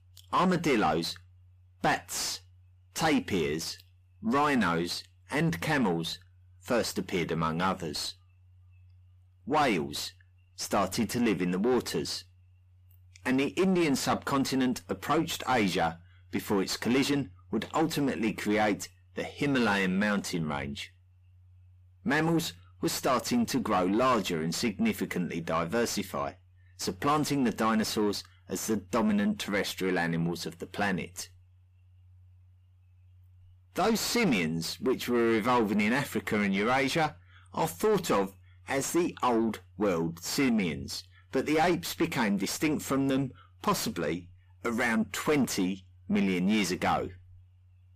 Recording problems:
distortion; heavy; 6 dB below the speech

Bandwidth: 15 kHz